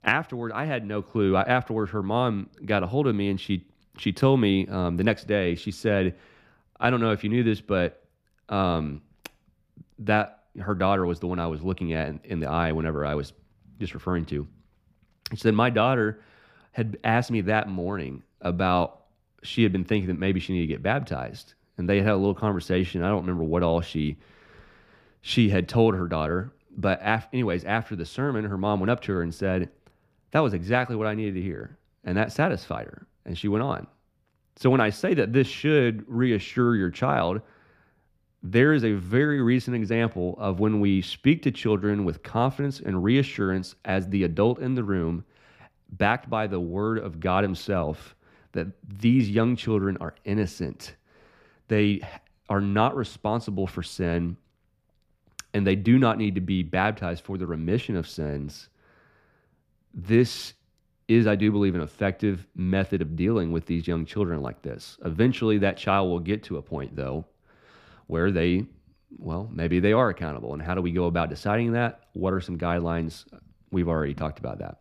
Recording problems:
none

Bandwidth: 15 kHz